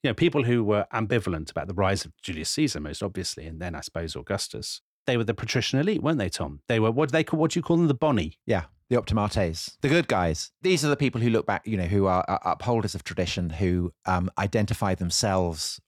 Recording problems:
none

